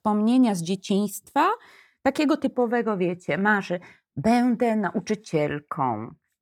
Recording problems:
none

